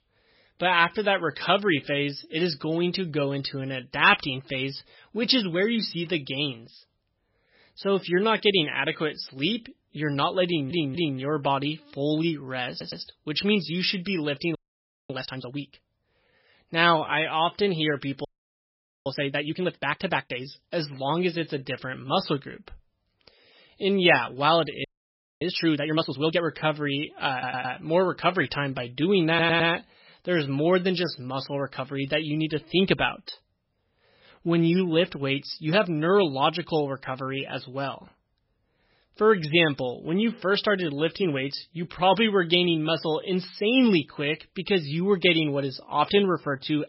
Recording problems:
garbled, watery; badly; nothing above 5.5 kHz
audio stuttering; 4 times, first at 10 s
audio freezing; at 15 s for 0.5 s, at 18 s for 1 s and at 25 s for 0.5 s

